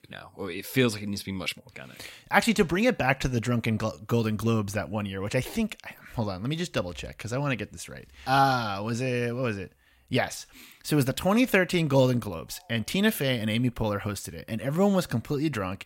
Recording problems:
none

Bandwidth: 16 kHz